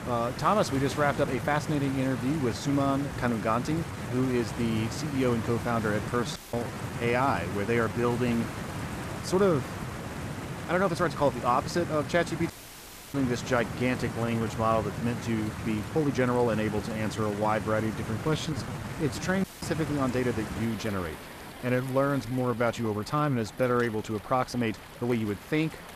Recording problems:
rain or running water; loud; throughout; 8 dB below the speech
uneven, jittery; strongly; from 1 to 25 s
audio cutting out; at 6.5 s, at 13 s for 0.5 s and at 19 s

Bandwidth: 14.5 kHz